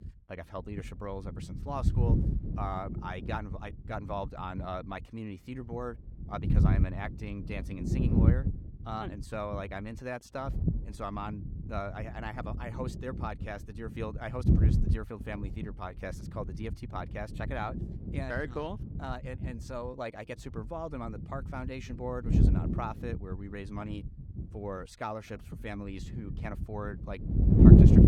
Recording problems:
wind noise on the microphone; heavy; 2 dB above the speech

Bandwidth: 17.5 kHz